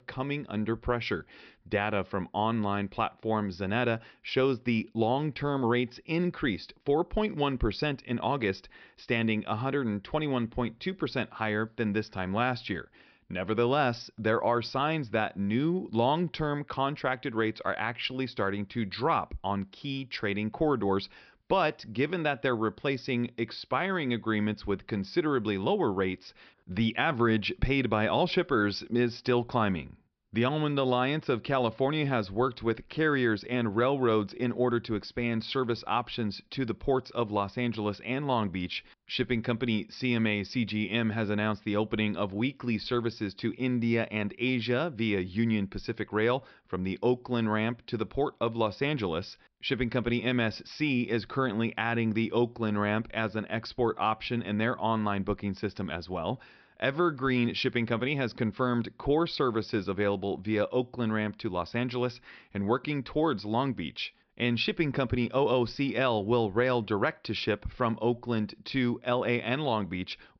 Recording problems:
high frequencies cut off; noticeable; nothing above 5.5 kHz

